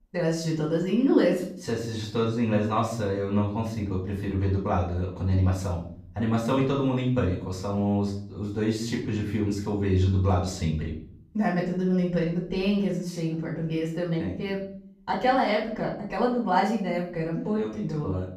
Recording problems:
off-mic speech; far
room echo; noticeable; dies away in 0.5 s

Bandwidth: 15.5 kHz